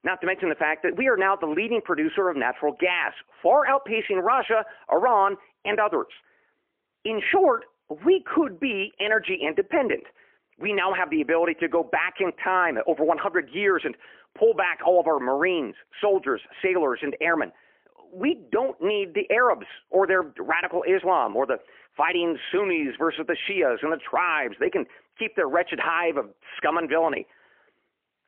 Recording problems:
phone-call audio; poor line; nothing above 3 kHz

